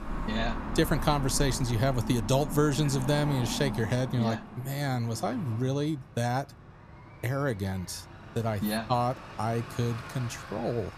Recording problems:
traffic noise; loud; throughout; 10 dB below the speech

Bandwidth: 14.5 kHz